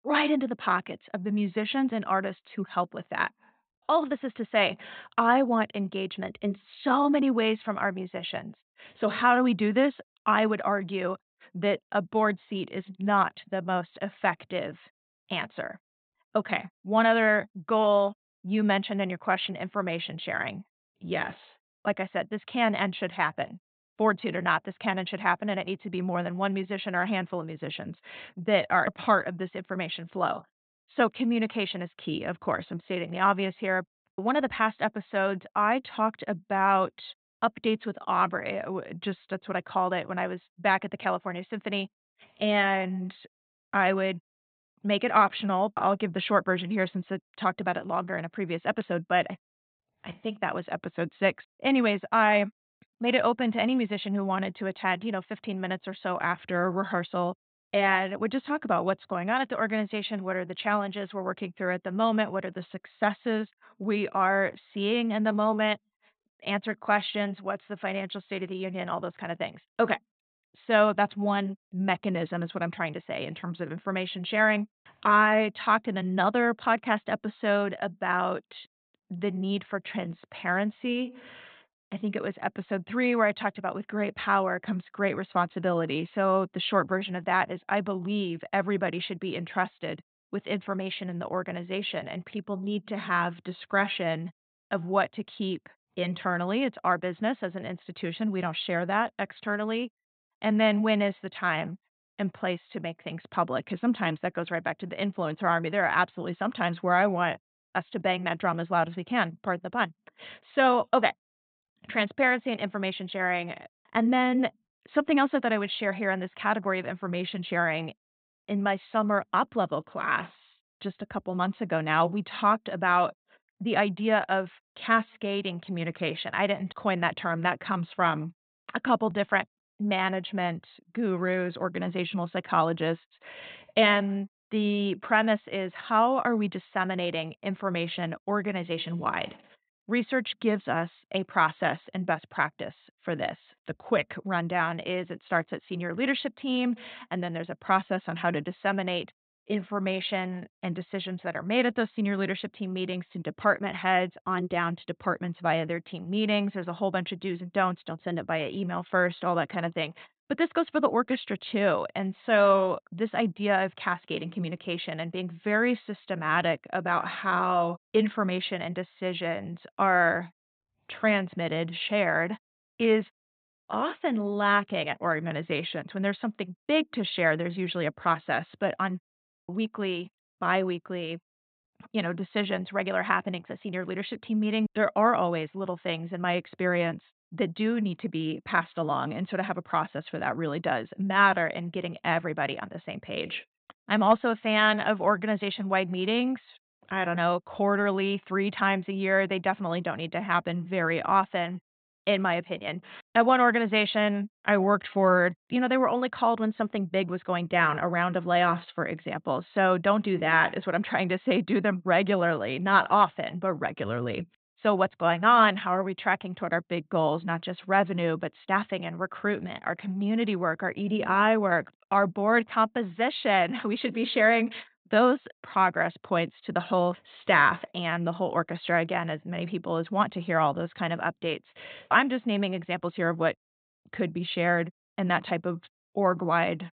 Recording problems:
high frequencies cut off; severe; nothing above 4 kHz

